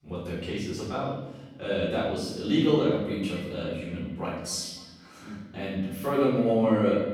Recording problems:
room echo; strong; dies away in 1 s
off-mic speech; far
echo of what is said; faint; from 2.5 s on; 270 ms later, 20 dB below the speech

